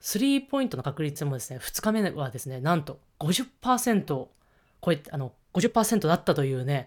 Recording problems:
uneven, jittery; strongly; from 0.5 to 5.5 s

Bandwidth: 18.5 kHz